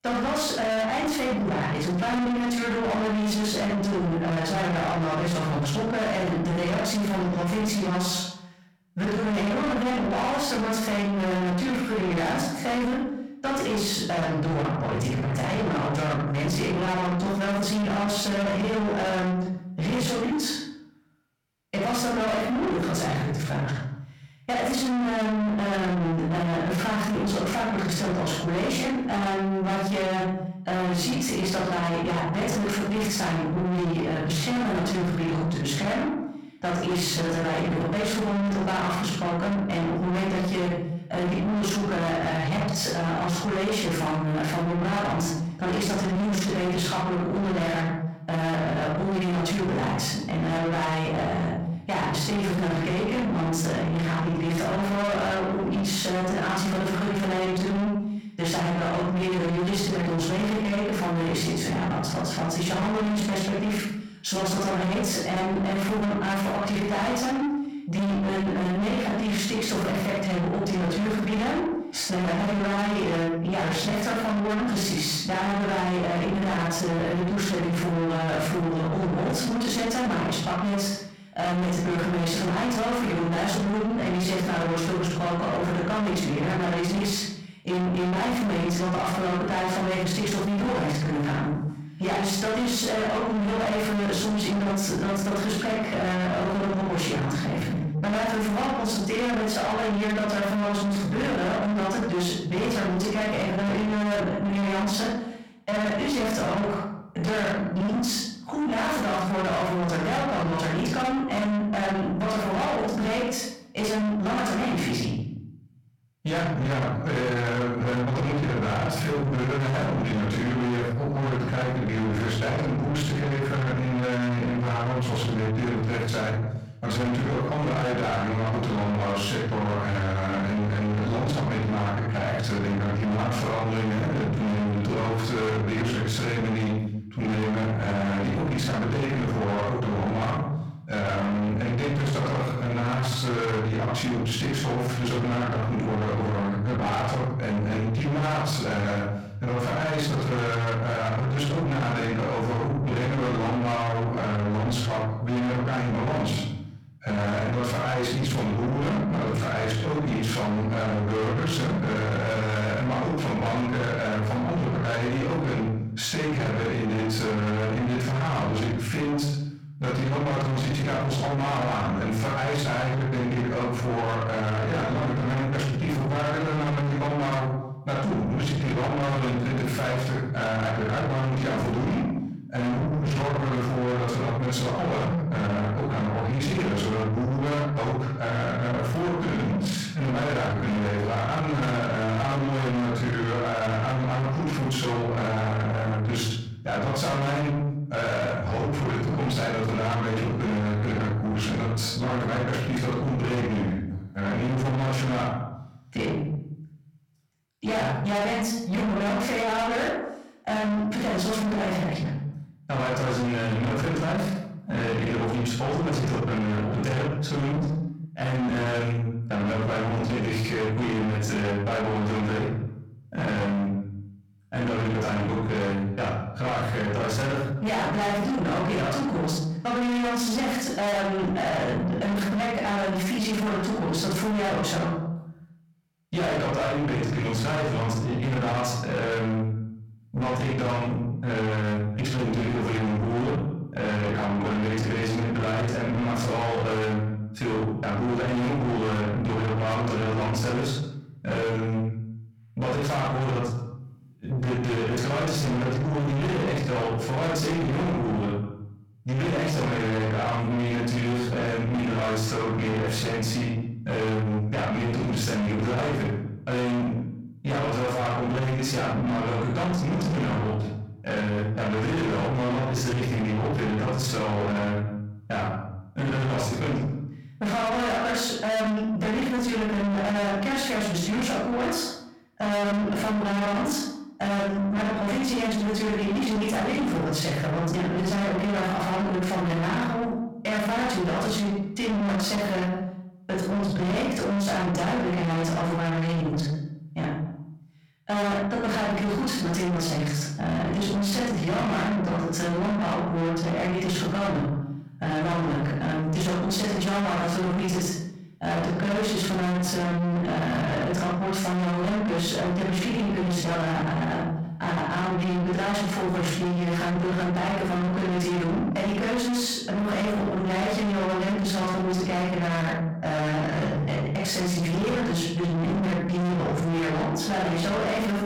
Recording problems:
distortion; heavy; 6 dB below the speech
off-mic speech; far
room echo; noticeable; dies away in 0.6 s

